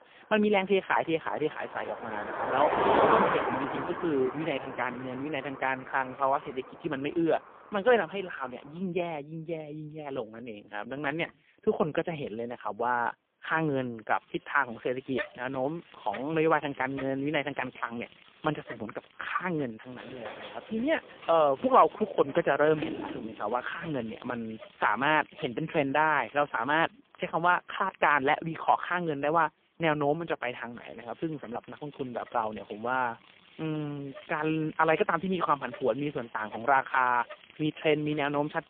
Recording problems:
phone-call audio; poor line; nothing above 3.5 kHz
traffic noise; loud; throughout; 4 dB below the speech
door banging; noticeable; from 20 to 24 s; peak 7 dB below the speech

